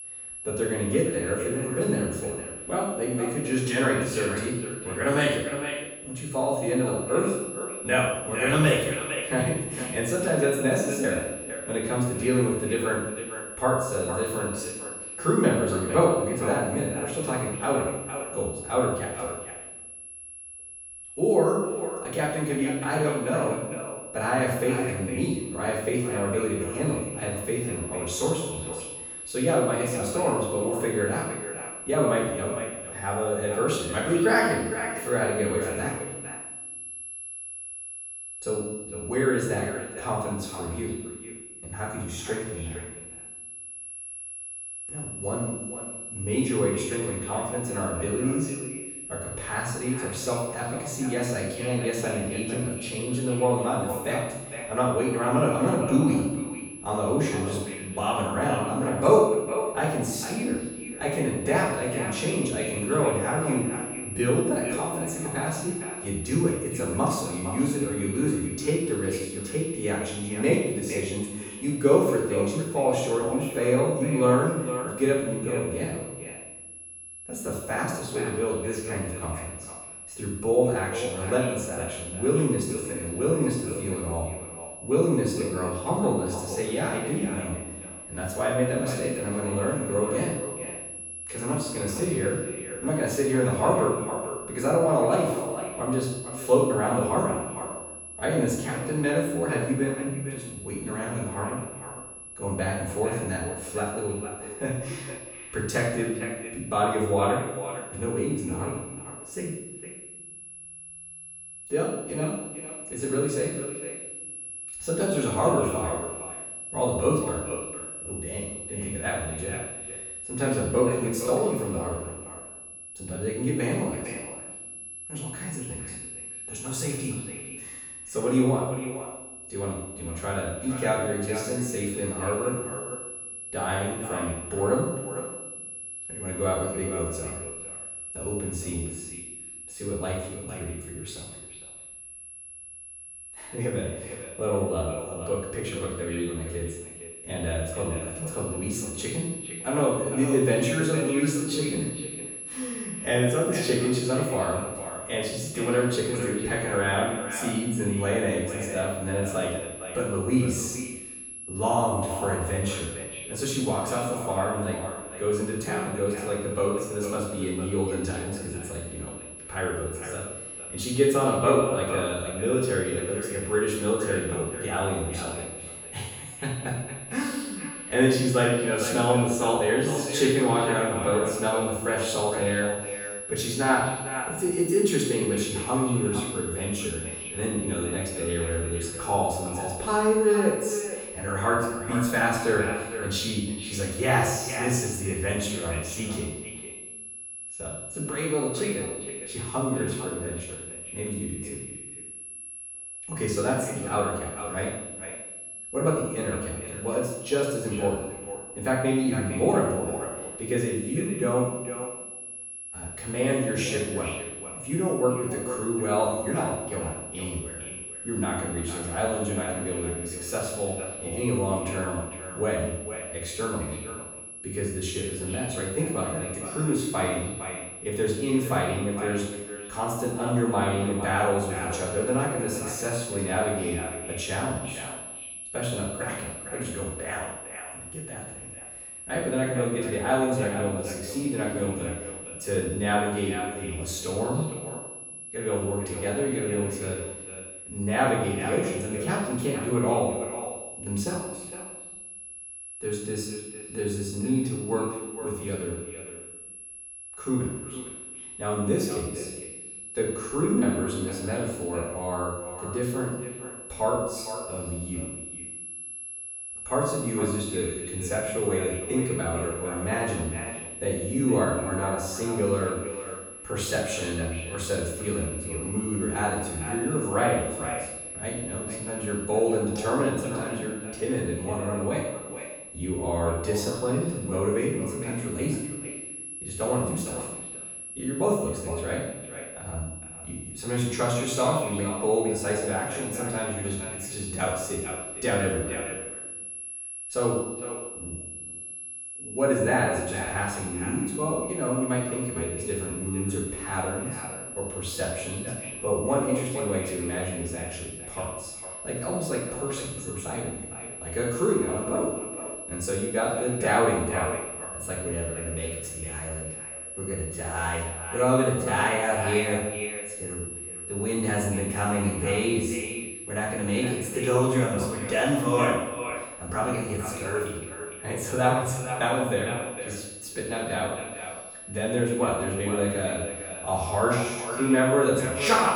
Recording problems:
echo of what is said; strong; throughout; 460 ms later, 10 dB below the speech
off-mic speech; far
room echo; noticeable; dies away in 0.9 s
high-pitched whine; loud; throughout; 11 kHz, 9 dB below the speech

